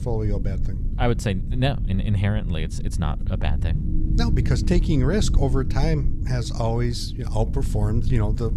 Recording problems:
background music; noticeable; throughout; 15 dB below the speech
low rumble; noticeable; throughout; 10 dB below the speech

